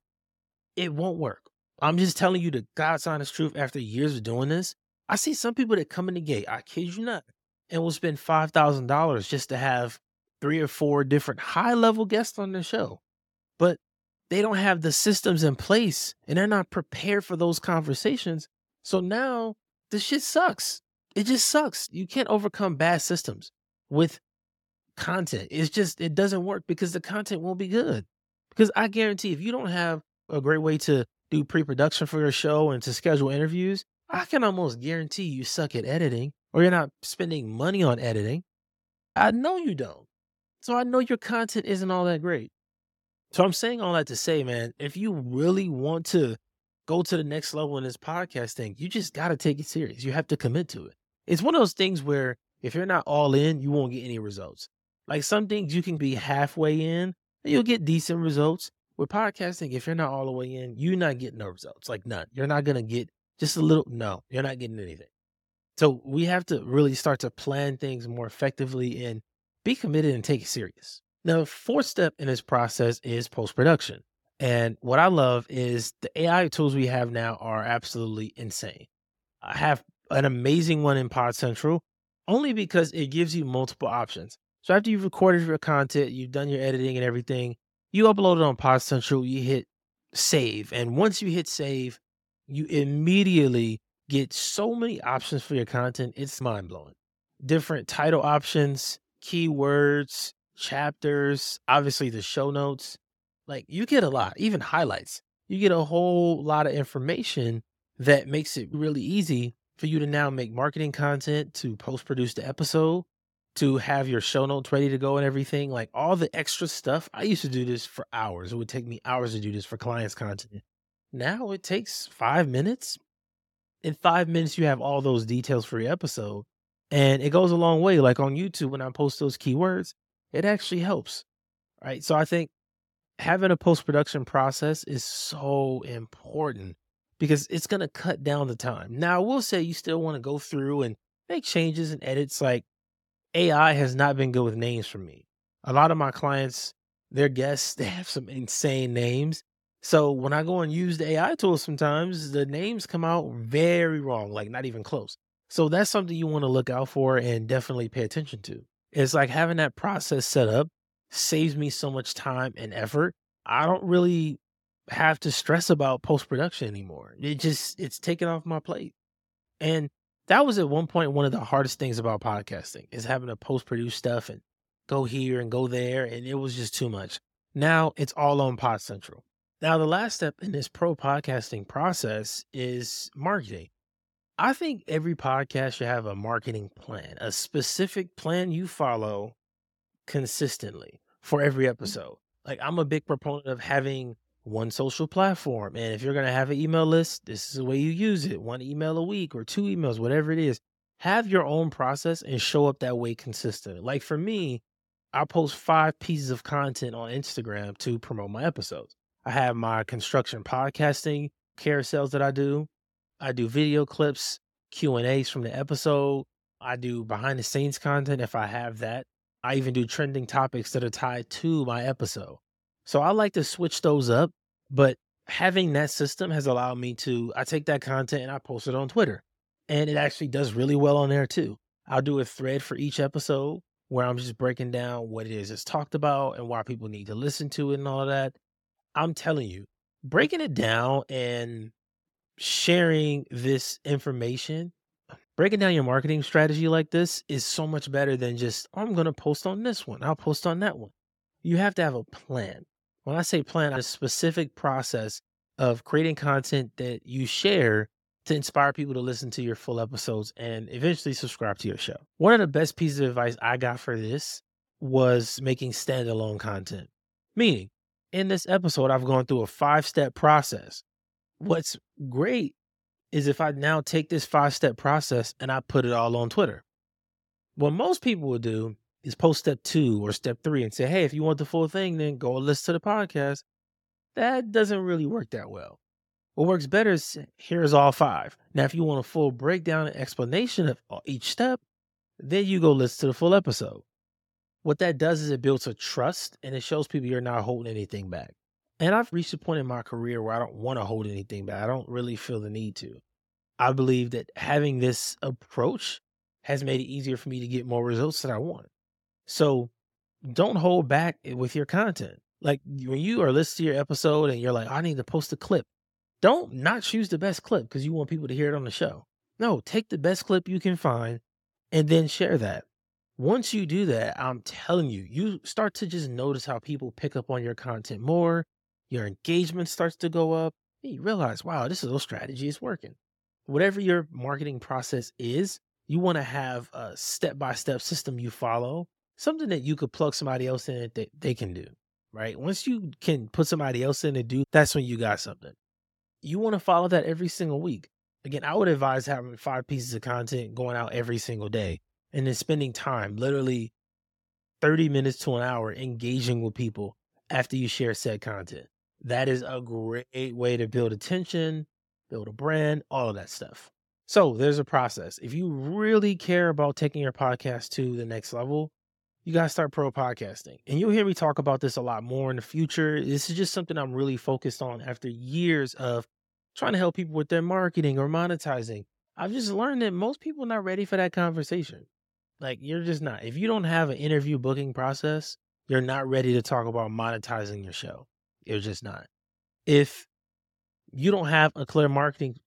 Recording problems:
none

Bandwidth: 17 kHz